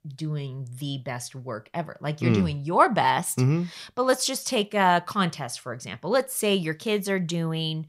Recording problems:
none

